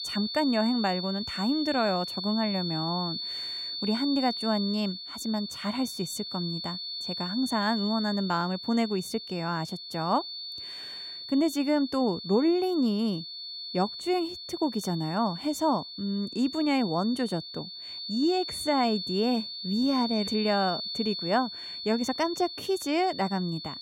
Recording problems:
high-pitched whine; loud; throughout; 4.5 kHz, 6 dB below the speech

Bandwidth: 16 kHz